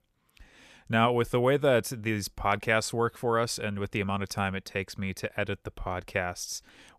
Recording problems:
none

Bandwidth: 14.5 kHz